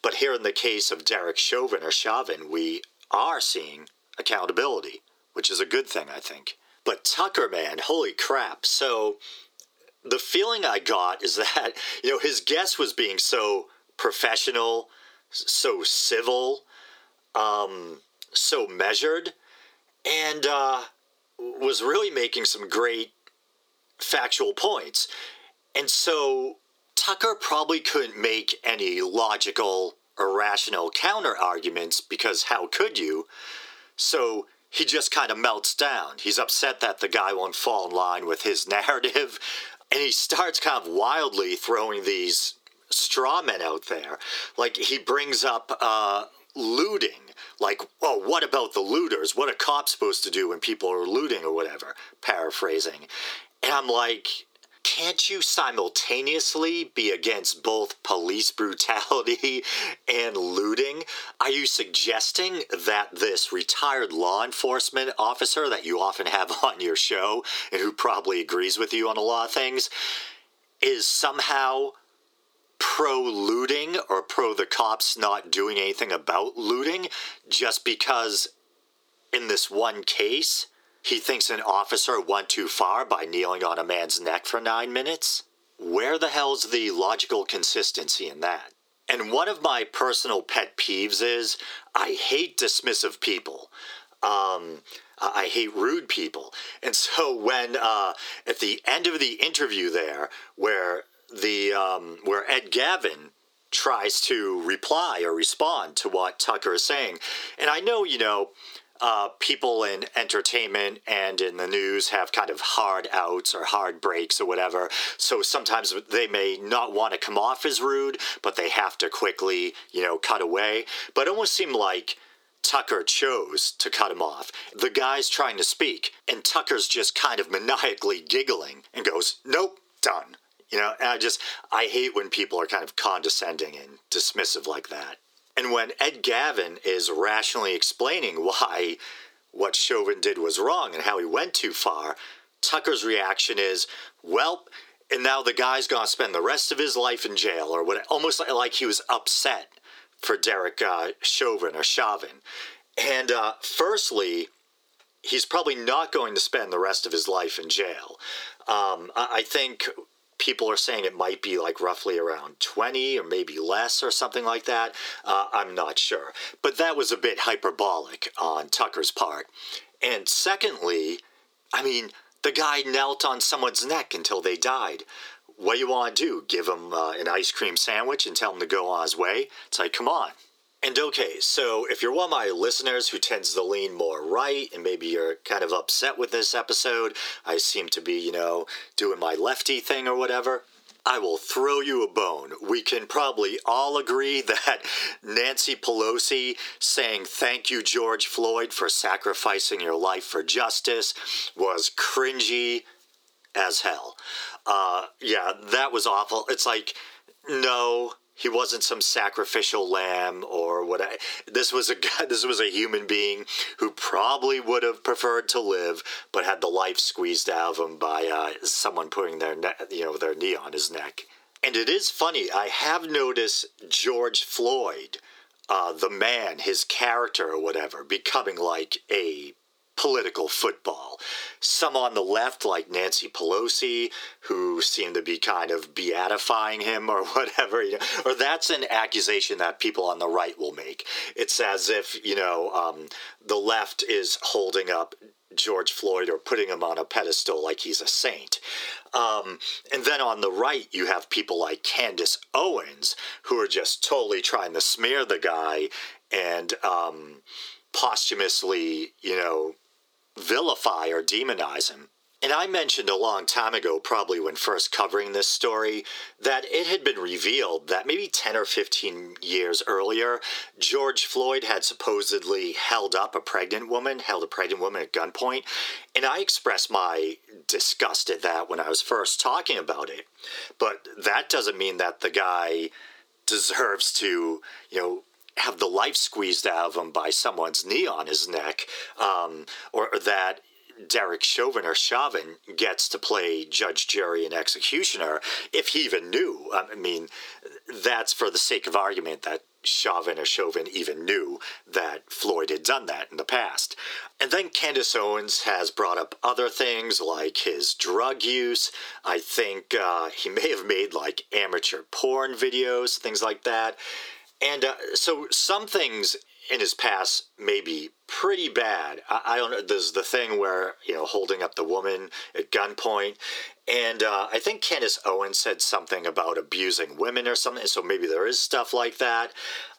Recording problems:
thin; very; fading below 350 Hz
squashed, flat; heavily

